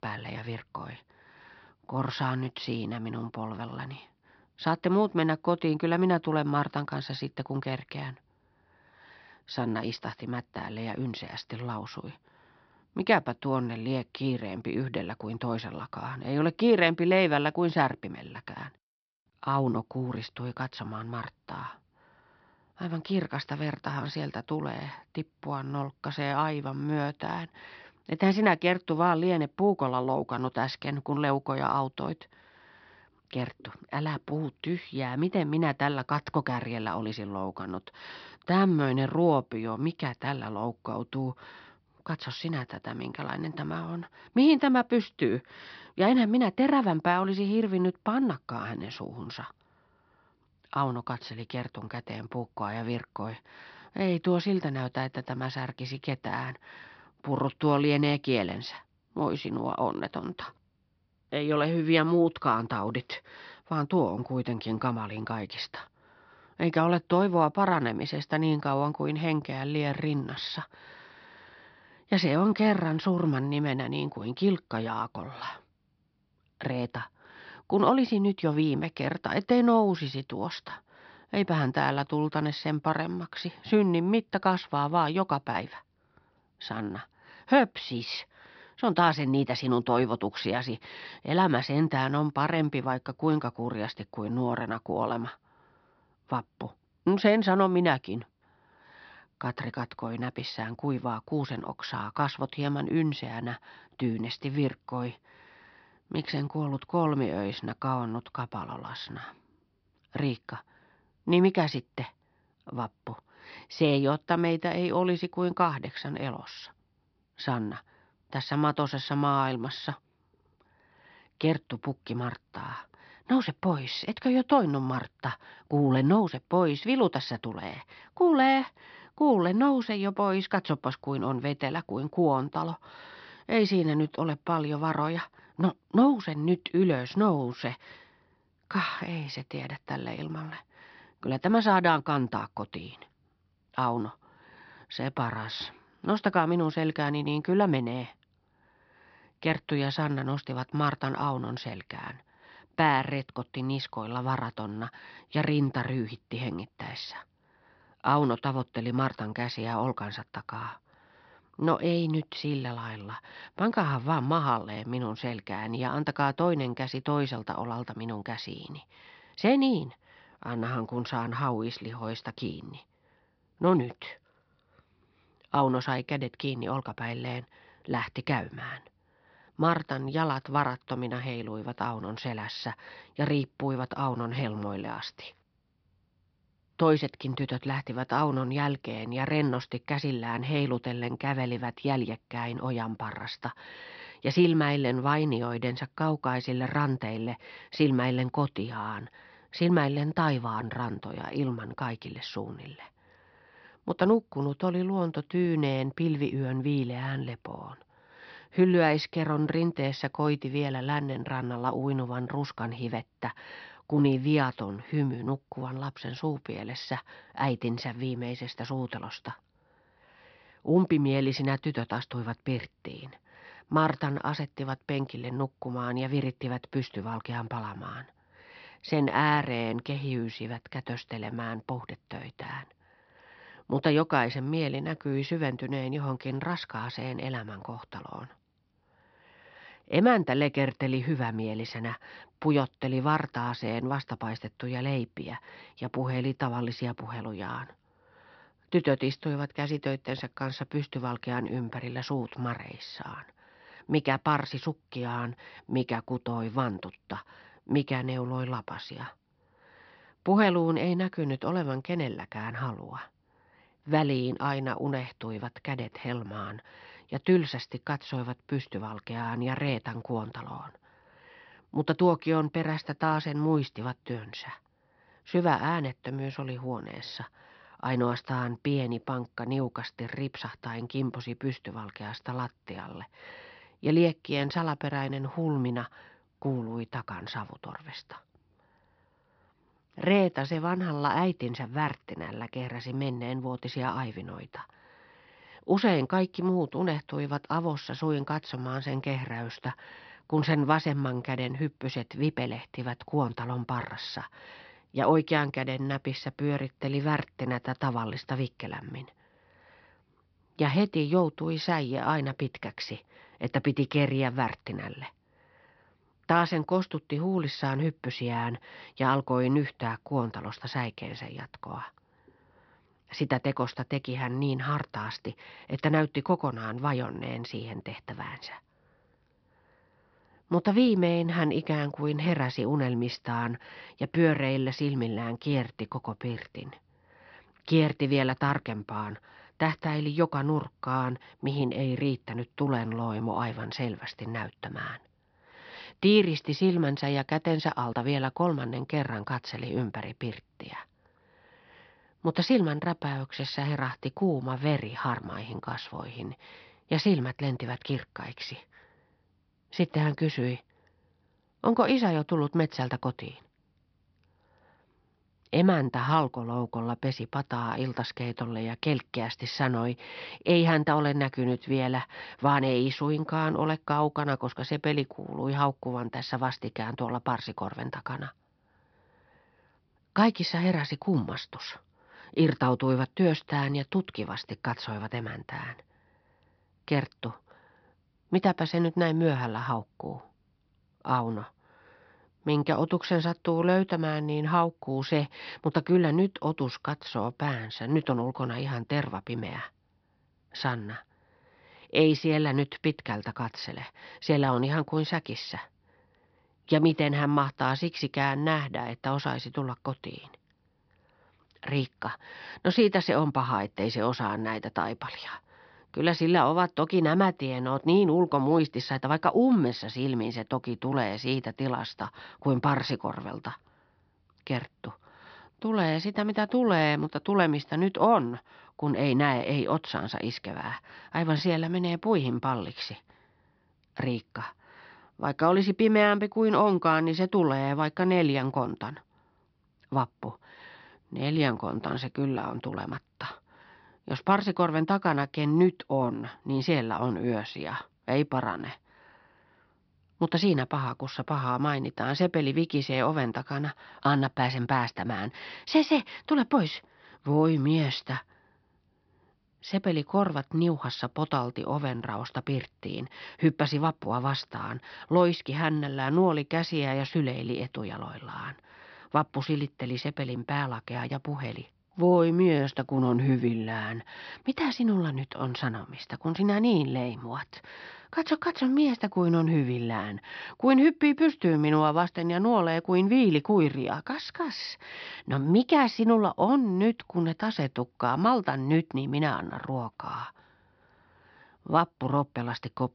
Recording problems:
high frequencies cut off; noticeable; nothing above 5.5 kHz

